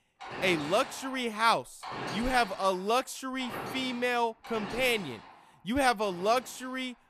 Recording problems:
machinery noise; noticeable; throughout; 10 dB below the speech

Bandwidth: 14.5 kHz